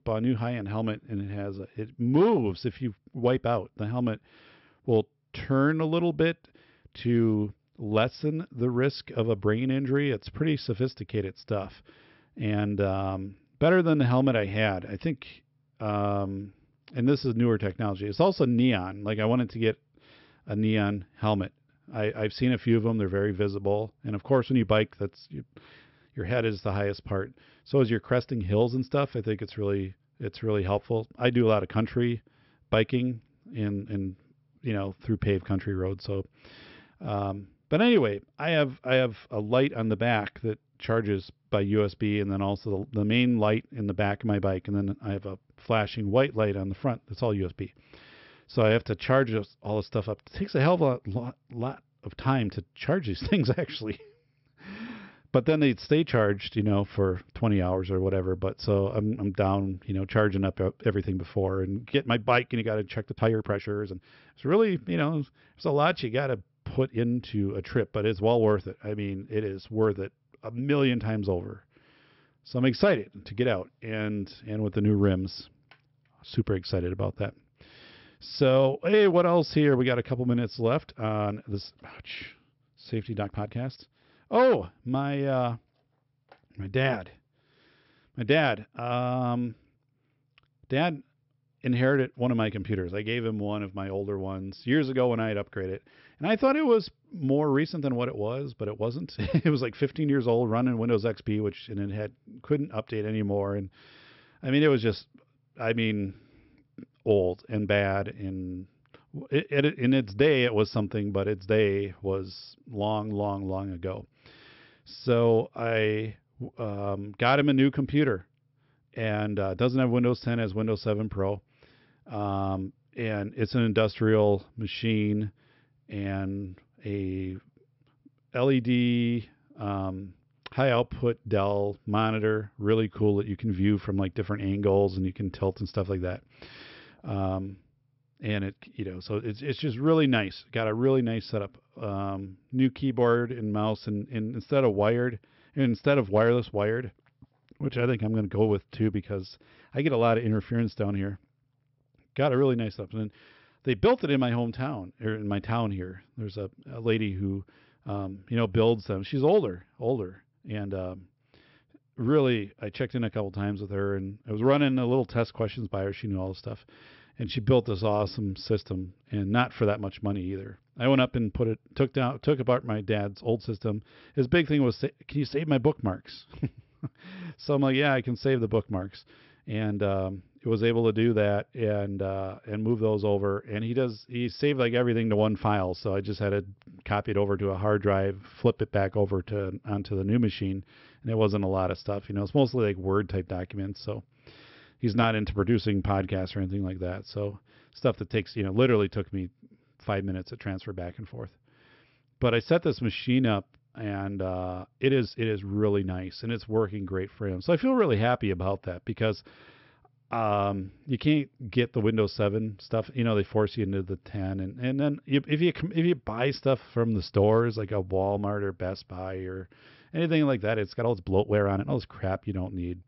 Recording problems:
high frequencies cut off; noticeable; nothing above 5.5 kHz
uneven, jittery; strongly; from 1.5 s to 3:42

